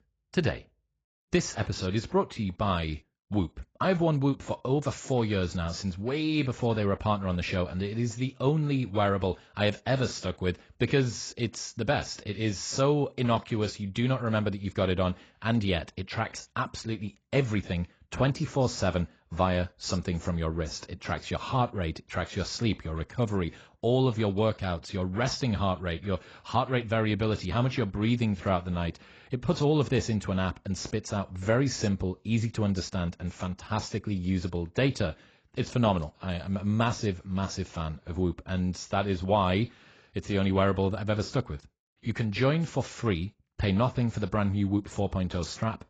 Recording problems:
garbled, watery; badly; nothing above 7.5 kHz

